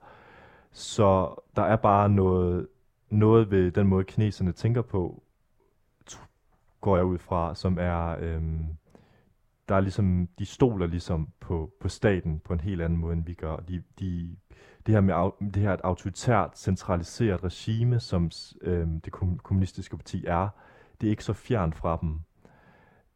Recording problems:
muffled; slightly; fading above 2.5 kHz

